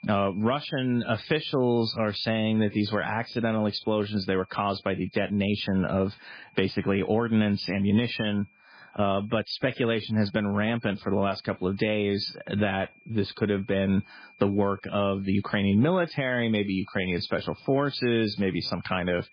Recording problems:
garbled, watery; badly
high-pitched whine; faint; throughout; 2.5 kHz, 30 dB below the speech

